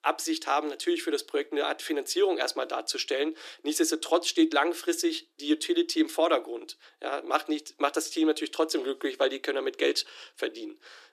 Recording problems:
thin; very; fading below 300 Hz

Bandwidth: 14.5 kHz